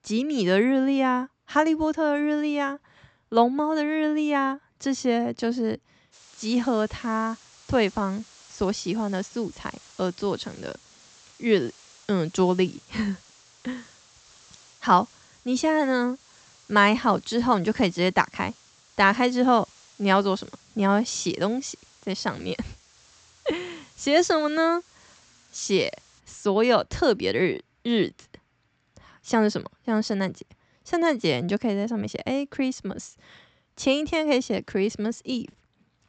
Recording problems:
high frequencies cut off; noticeable; nothing above 8 kHz
hiss; faint; from 6 to 26 s; 25 dB below the speech

